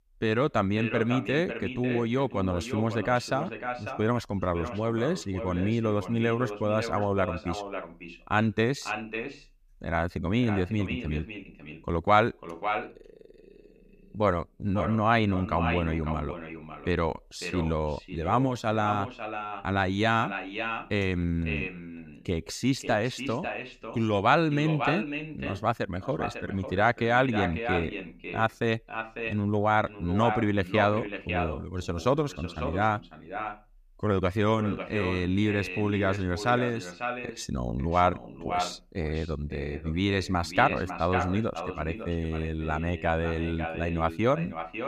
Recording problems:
echo of what is said; strong; throughout; 550 ms later, 8 dB below the speech

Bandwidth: 15 kHz